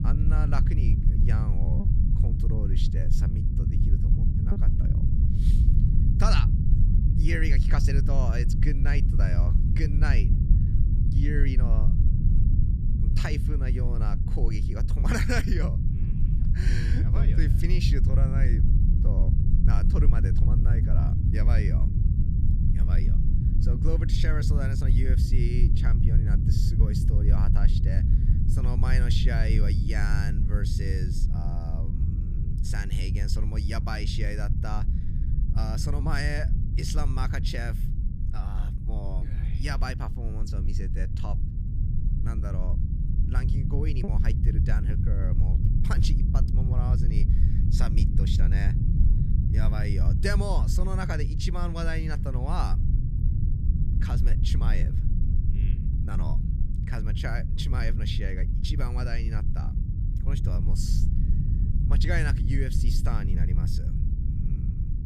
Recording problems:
low rumble; loud; throughout; 3 dB below the speech
choppy; occasionally; from 2 to 4.5 s and from 44 to 46 s; 2% of the speech affected

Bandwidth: 14.5 kHz